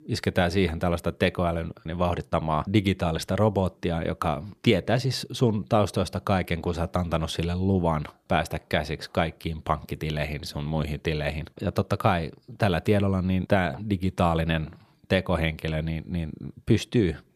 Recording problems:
none

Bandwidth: 15 kHz